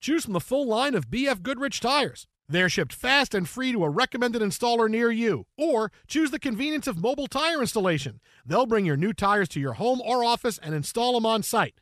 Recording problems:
none

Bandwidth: 14 kHz